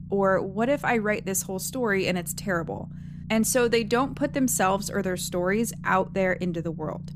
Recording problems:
low rumble; faint; throughout; 25 dB below the speech

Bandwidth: 15 kHz